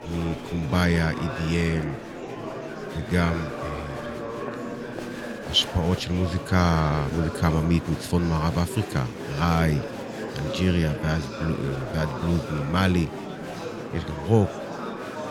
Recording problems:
murmuring crowd; loud; throughout; 9 dB below the speech

